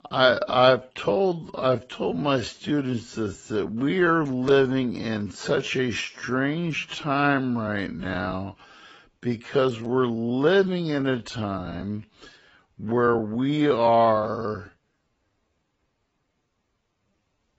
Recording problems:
garbled, watery; badly; nothing above 7.5 kHz
wrong speed, natural pitch; too slow; 0.6 times normal speed

